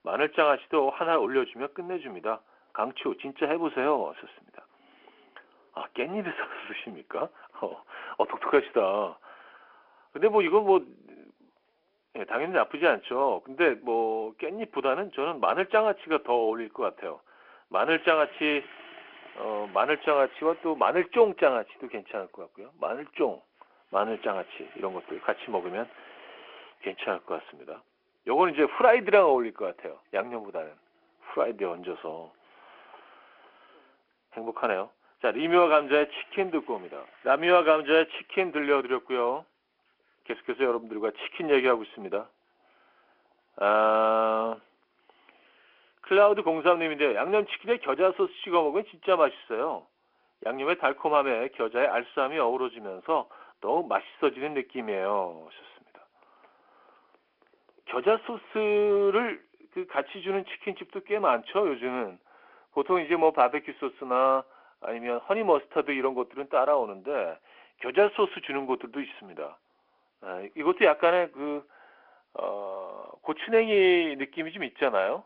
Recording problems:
phone-call audio
garbled, watery; slightly
household noises; faint; throughout; 25 dB below the speech

